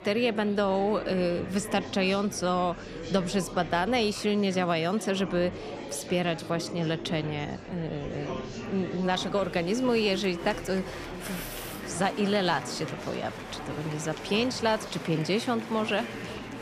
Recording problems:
murmuring crowd; loud; throughout; 10 dB below the speech

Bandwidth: 14.5 kHz